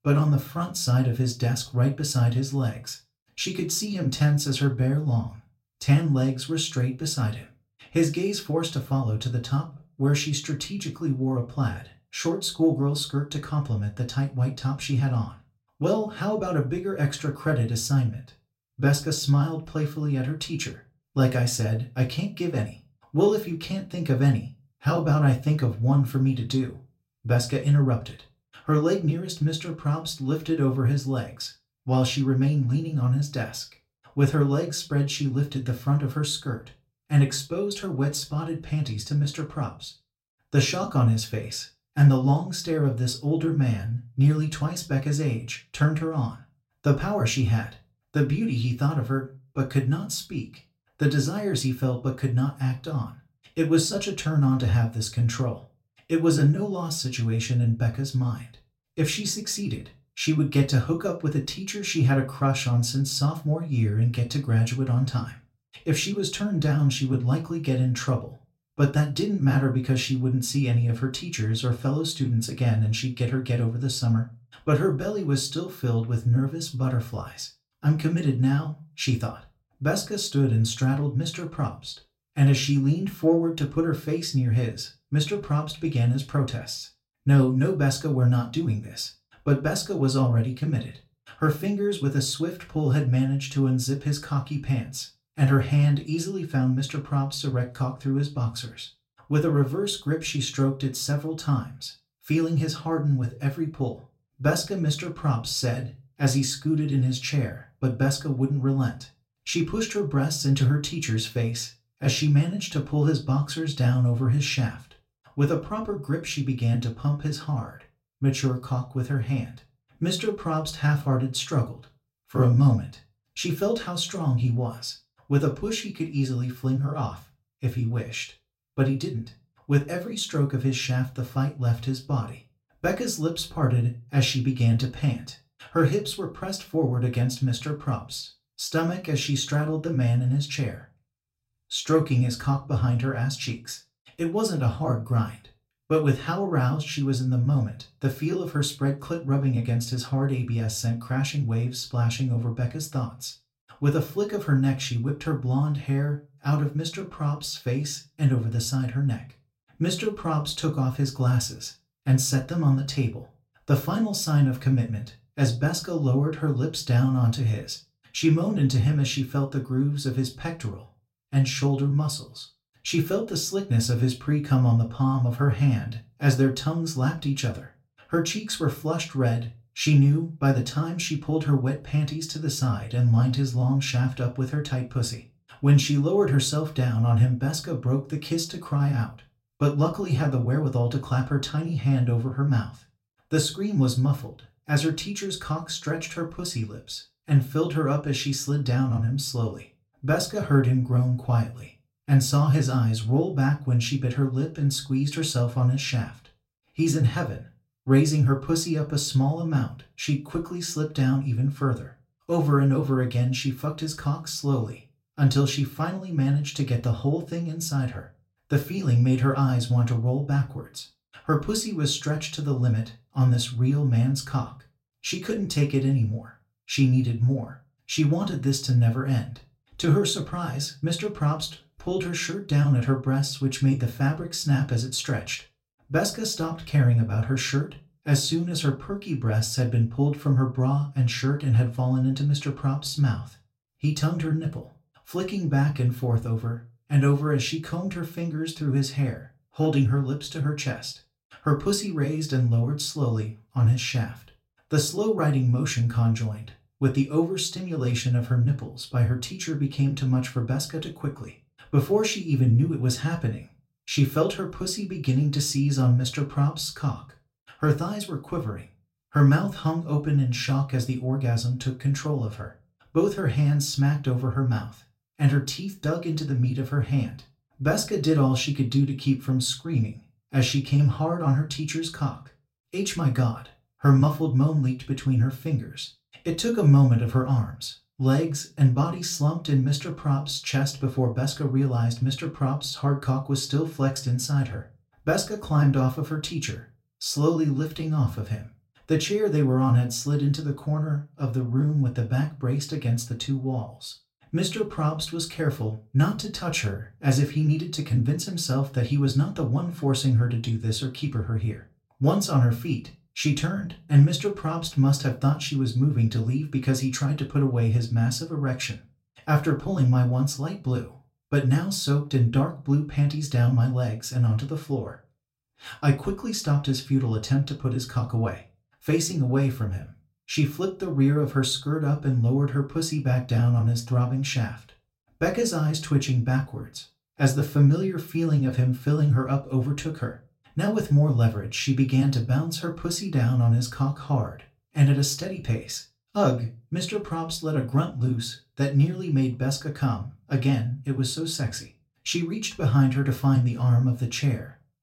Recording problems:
room echo; very slight; dies away in 0.2 s
off-mic speech; somewhat distant

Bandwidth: 16 kHz